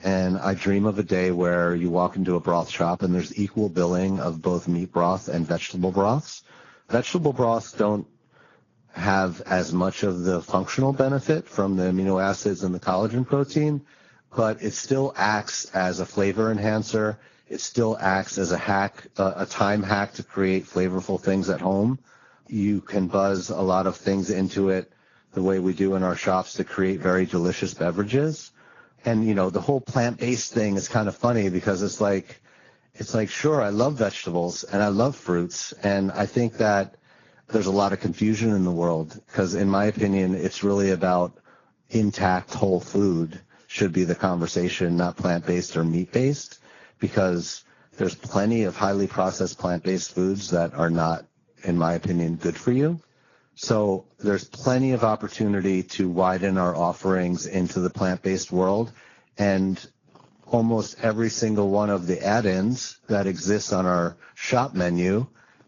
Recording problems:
garbled, watery; badly
high frequencies cut off; noticeable; nothing above 7 kHz

